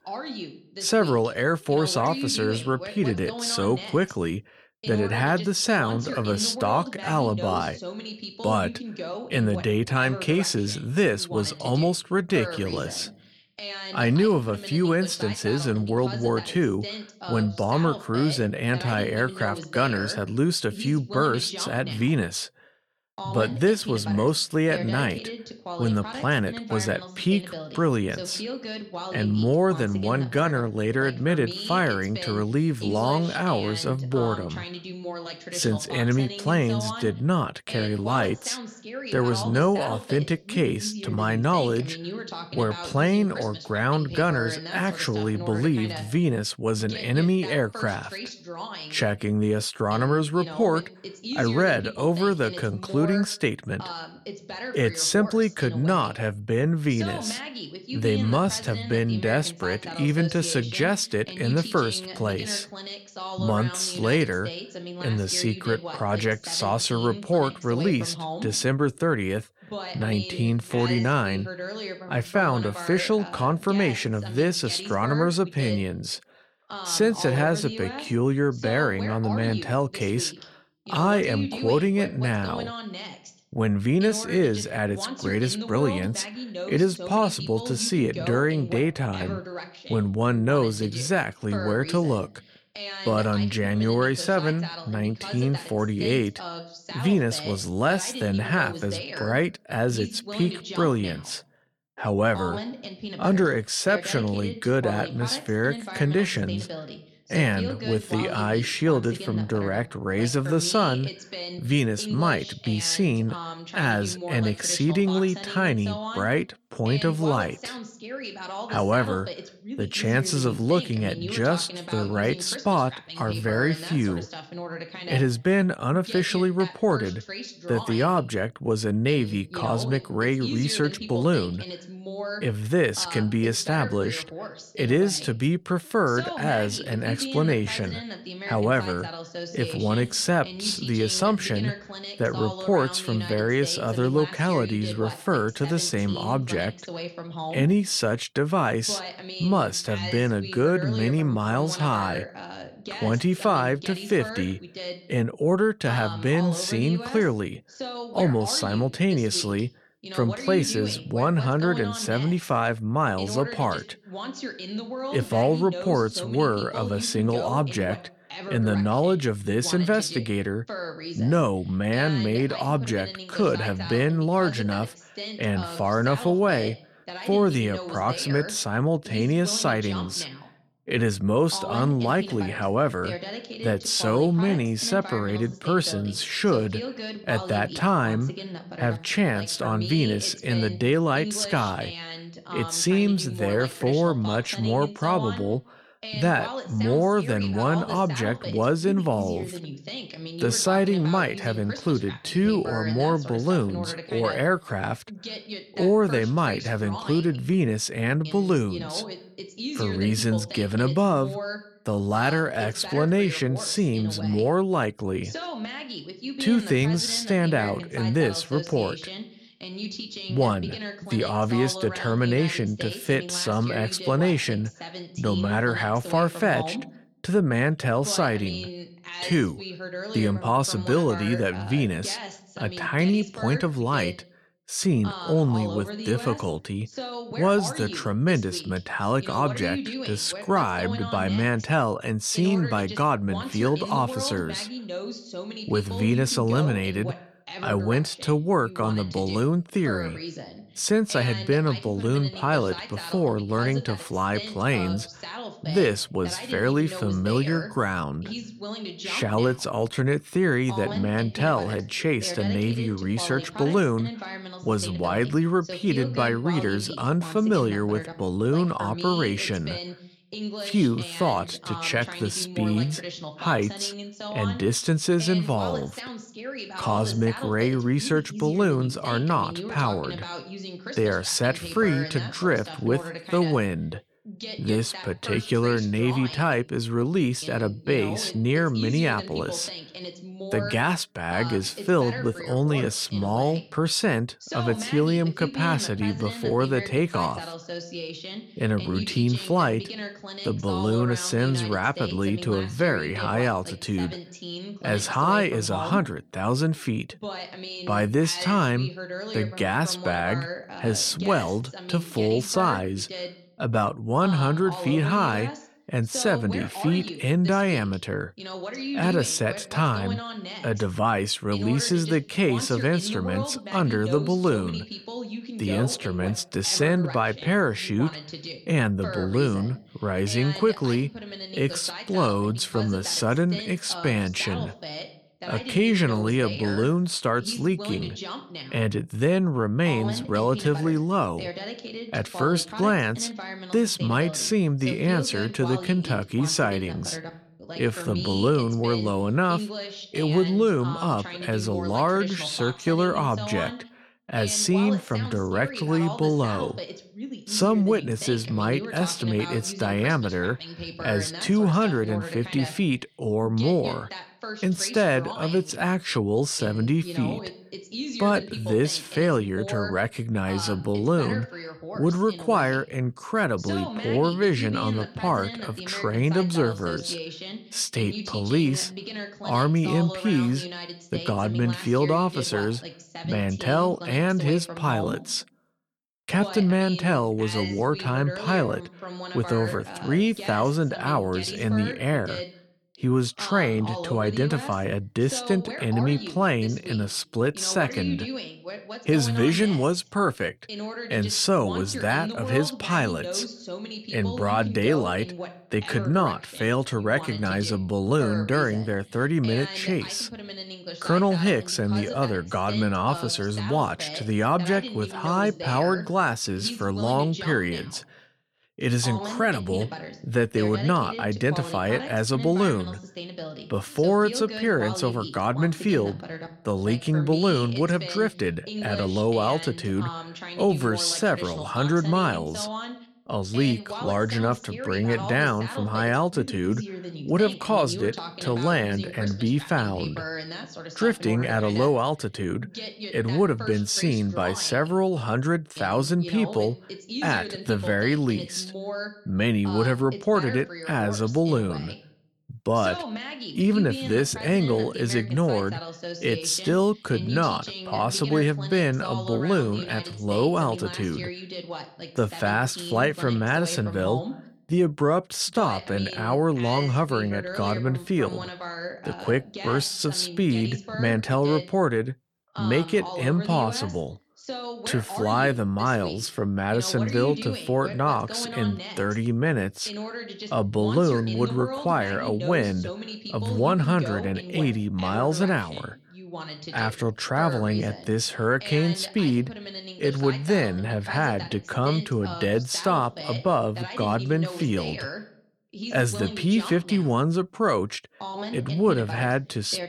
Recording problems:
voice in the background; noticeable; throughout; 10 dB below the speech

